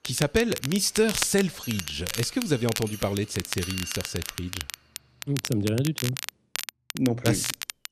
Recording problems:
crackle, like an old record; loud; 7 dB below the speech
machinery noise; noticeable; until 5.5 s; 15 dB below the speech

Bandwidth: 14 kHz